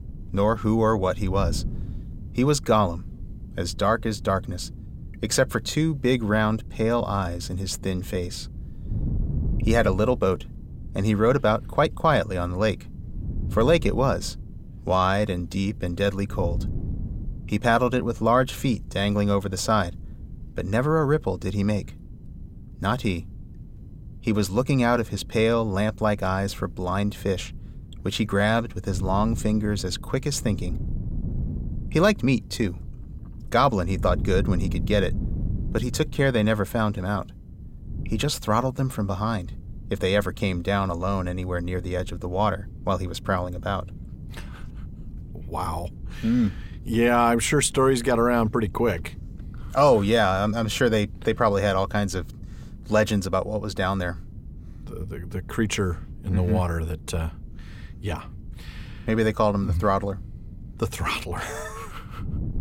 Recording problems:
wind noise on the microphone; occasional gusts; 25 dB below the speech

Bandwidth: 16 kHz